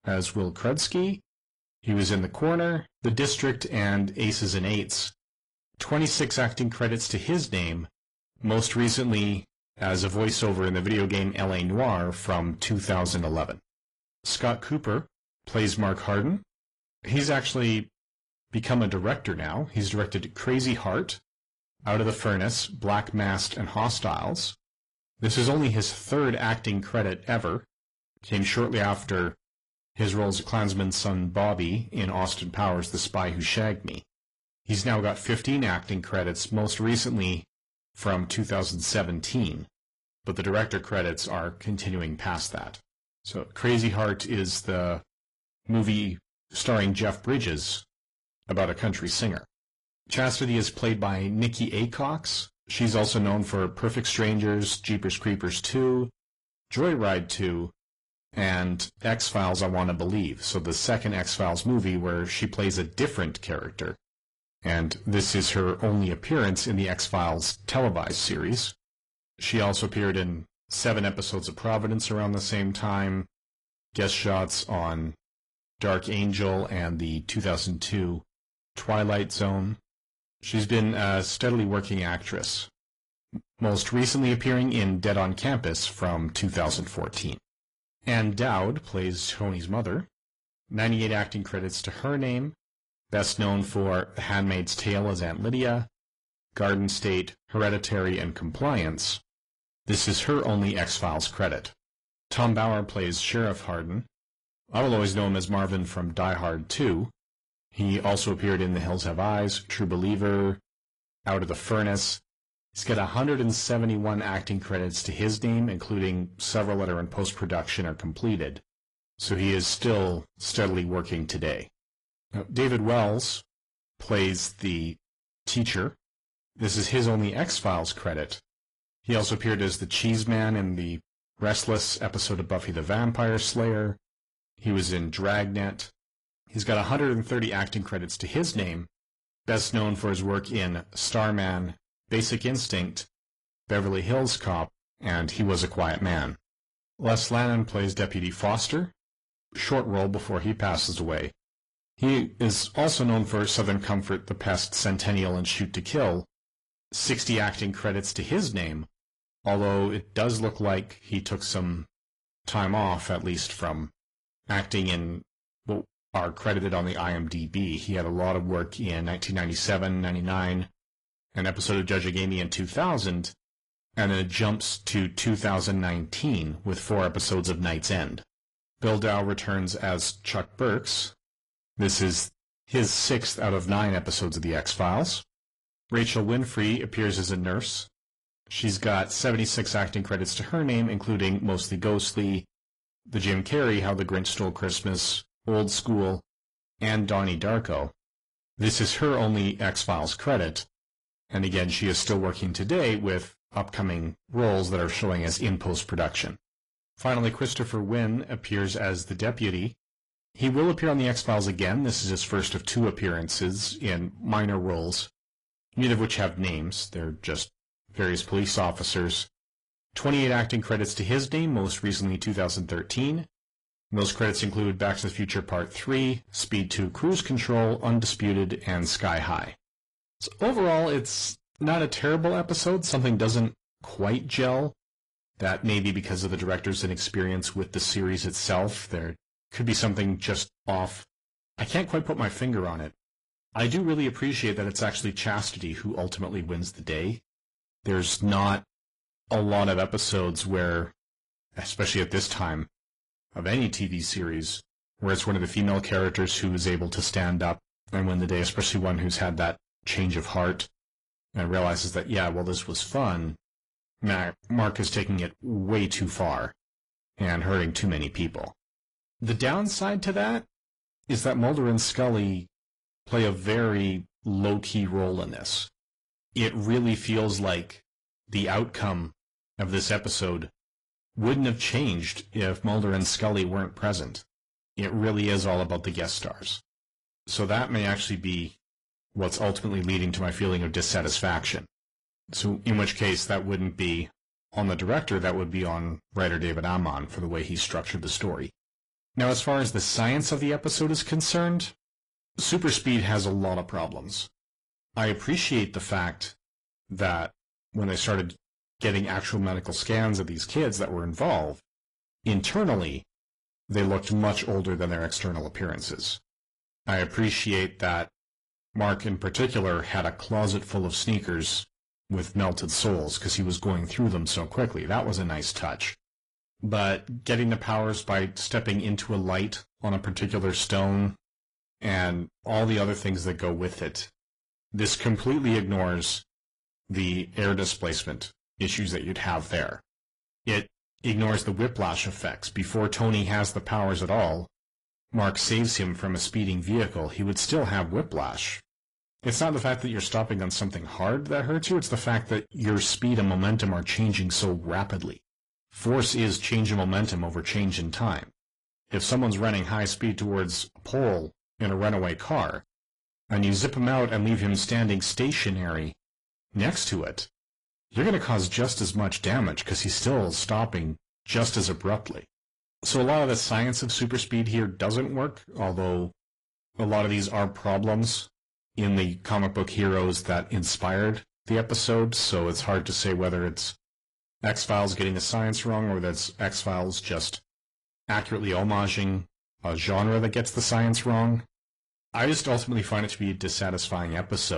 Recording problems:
distortion; slight; 10 dB below the speech
garbled, watery; slightly
abrupt cut into speech; at the end

